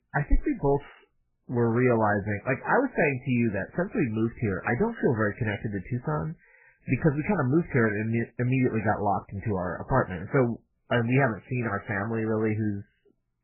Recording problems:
garbled, watery; badly; nothing above 3 kHz
high-pitched whine; very faint; throughout; 2.5 kHz, 75 dB below the speech

